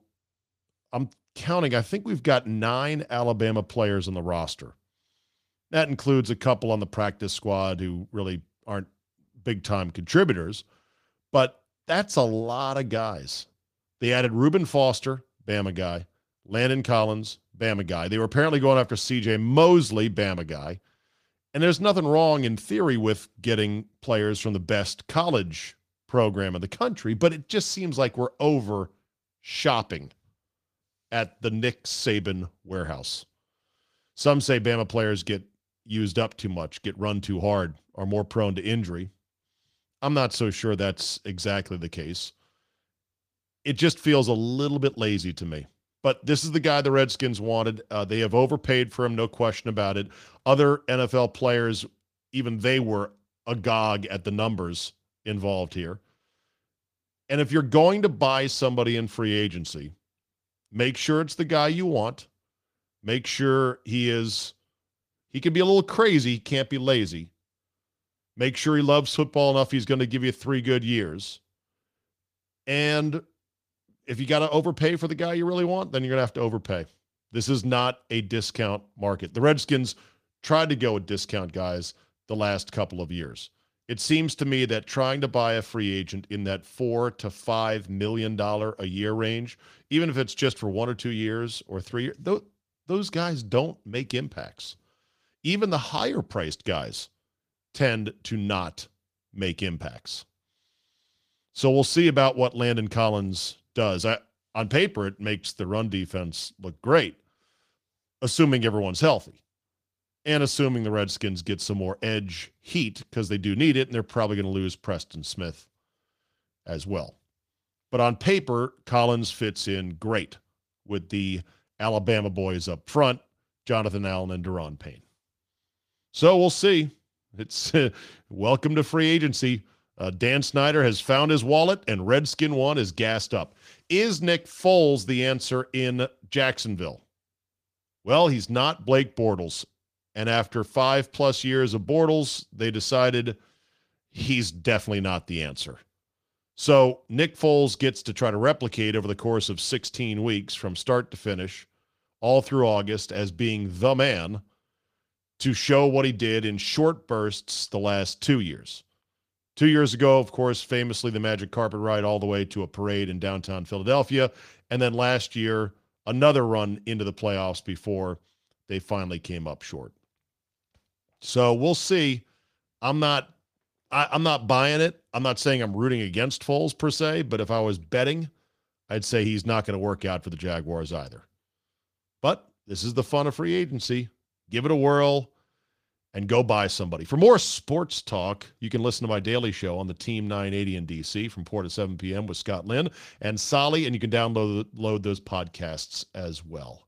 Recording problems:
garbled, watery; slightly; nothing above 15 kHz

